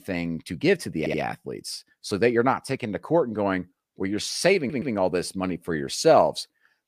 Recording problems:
audio stuttering; at 1 s and at 4.5 s

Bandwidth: 15 kHz